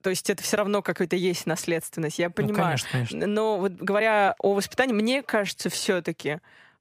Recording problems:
uneven, jittery; strongly; from 2 to 6 s

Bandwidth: 15 kHz